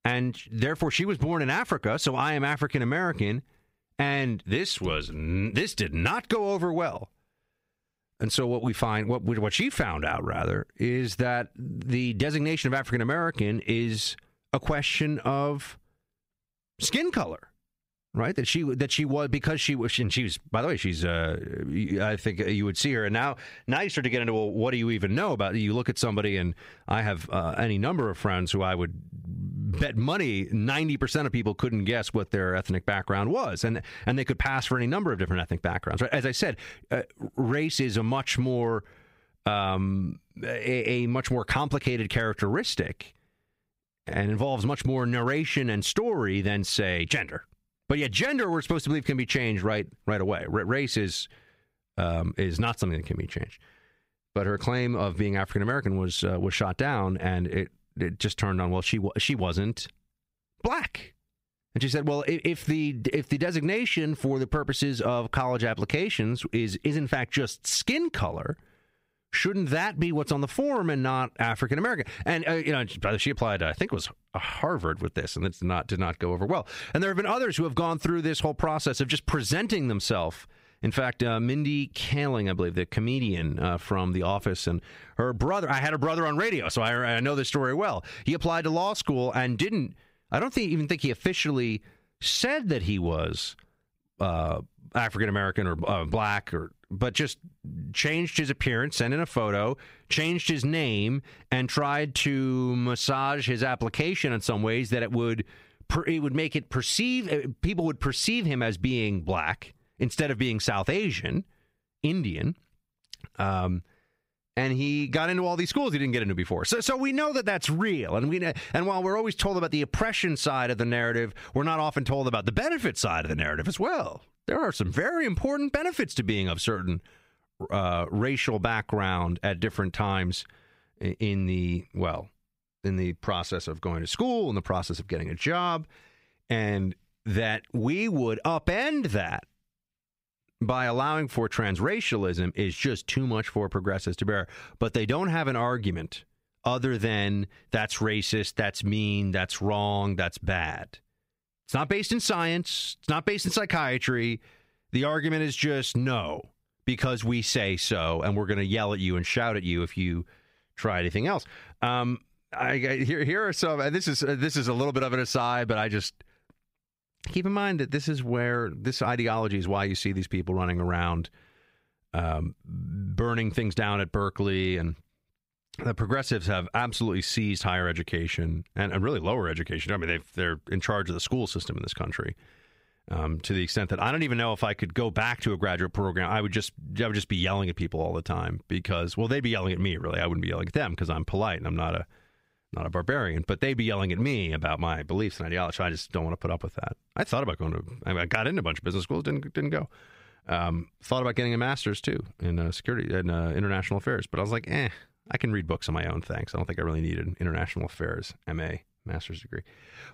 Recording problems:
squashed, flat; somewhat

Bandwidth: 15.5 kHz